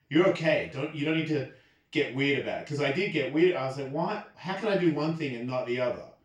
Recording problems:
off-mic speech; far
room echo; noticeable; dies away in 0.3 s

